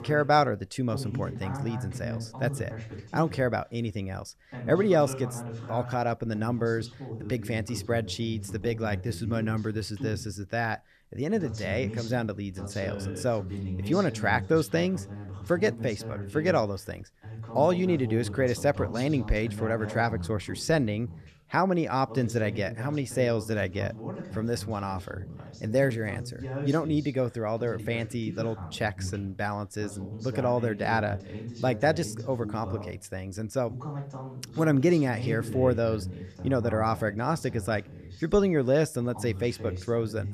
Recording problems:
voice in the background; loud; throughout; 10 dB below the speech

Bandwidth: 14 kHz